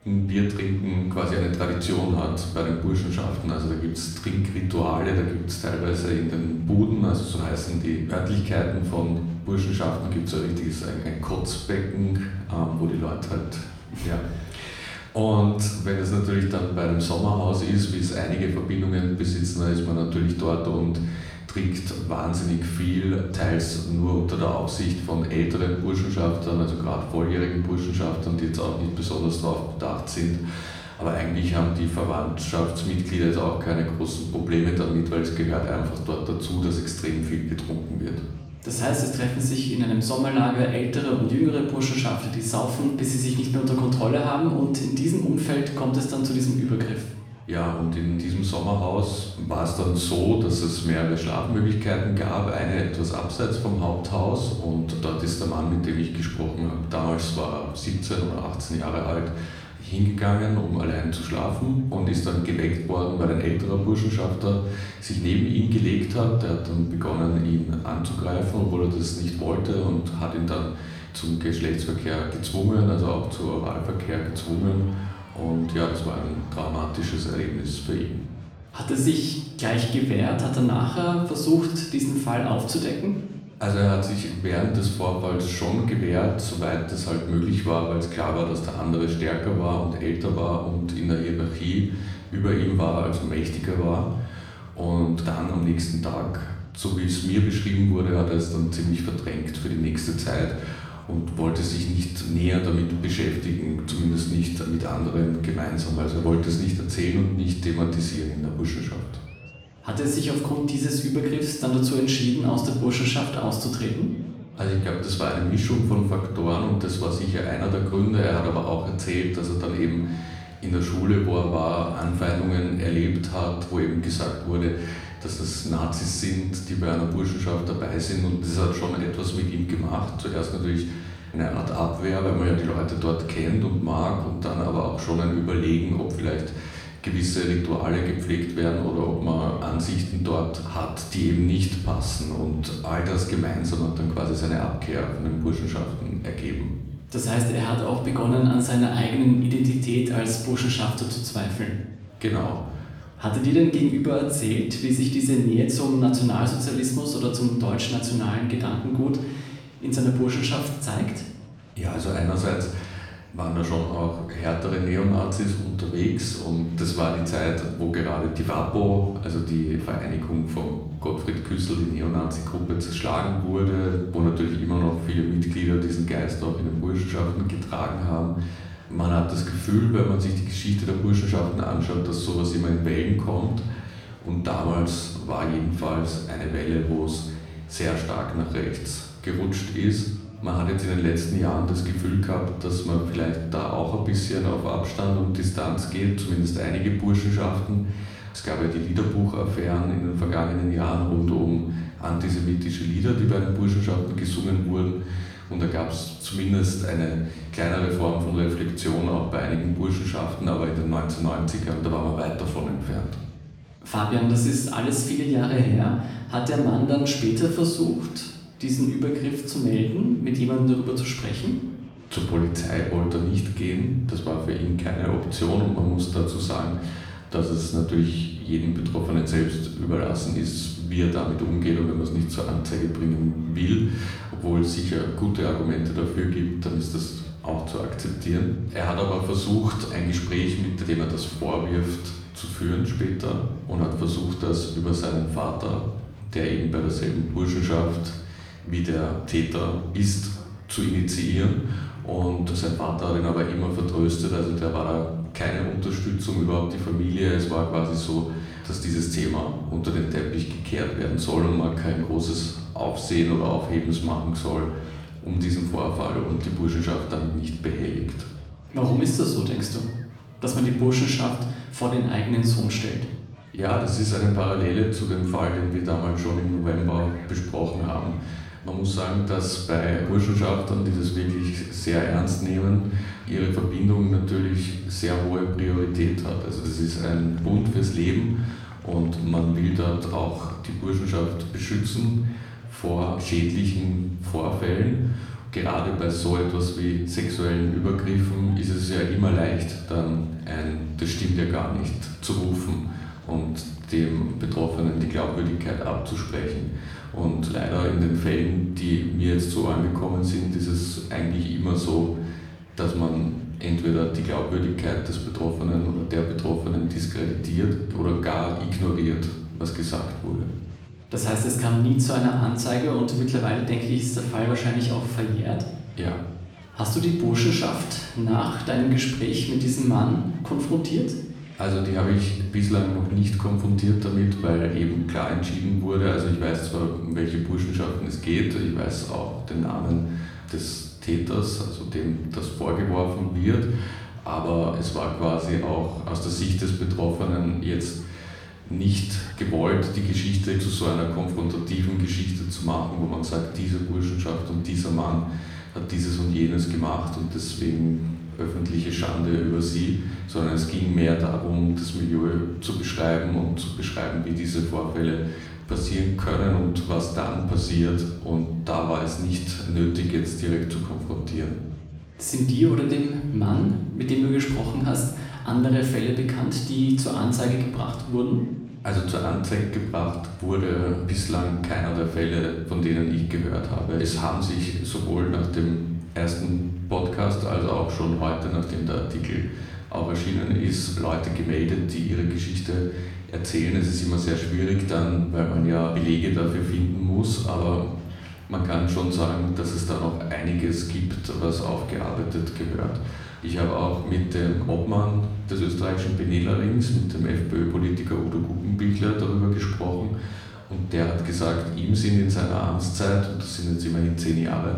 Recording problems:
off-mic speech; far
room echo; noticeable; dies away in 0.9 s
murmuring crowd; faint; throughout; 25 dB below the speech

